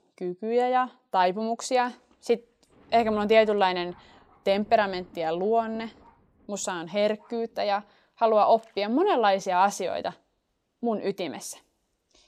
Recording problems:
rain or running water; faint; throughout; 30 dB below the speech

